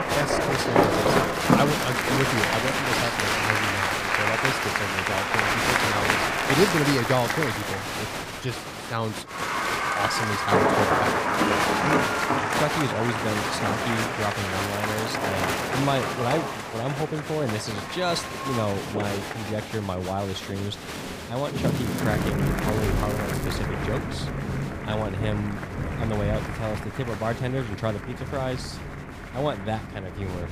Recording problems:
crowd noise; very loud; throughout; 2 dB above the speech
rain or running water; very loud; throughout; as loud as the speech
crackling; noticeable; 4 times, first at 1 s; 15 dB below the speech

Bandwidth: 15 kHz